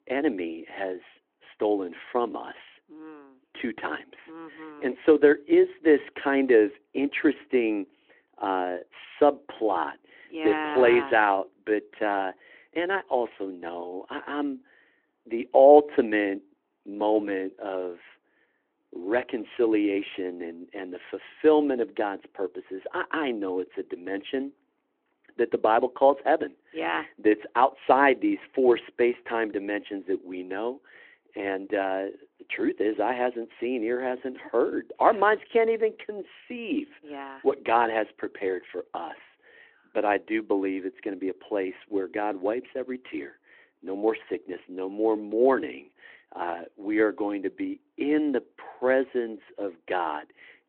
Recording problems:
phone-call audio

